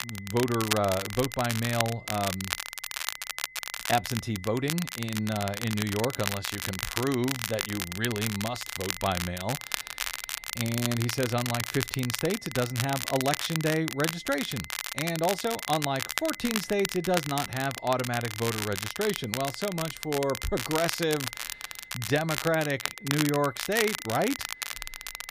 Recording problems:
crackle, like an old record; loud; 4 dB below the speech
high-pitched whine; noticeable; throughout; 2 kHz, 20 dB below the speech

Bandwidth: 15 kHz